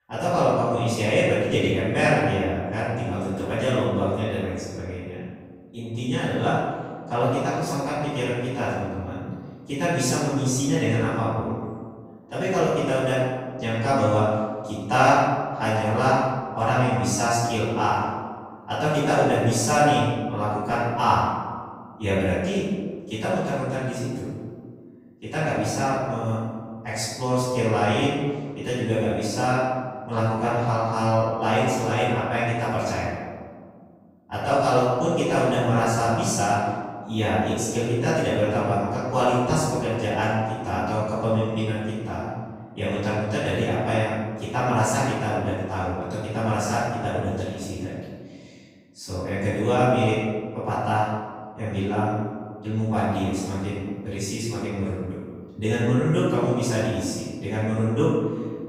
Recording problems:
room echo; strong; dies away in 1.6 s
off-mic speech; far

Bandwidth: 15.5 kHz